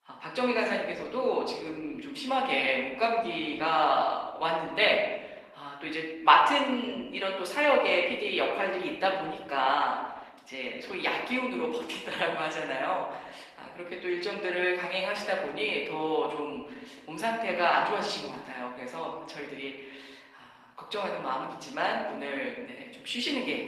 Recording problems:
room echo; noticeable; dies away in 0.9 s
thin; somewhat; fading below 350 Hz
off-mic speech; somewhat distant
garbled, watery; slightly; nothing above 14.5 kHz

